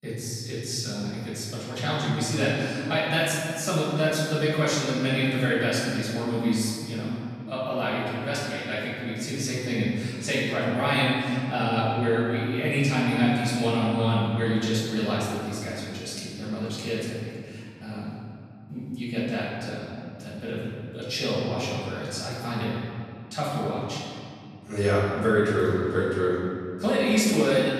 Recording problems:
room echo; strong; dies away in 2.3 s
off-mic speech; far

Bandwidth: 14 kHz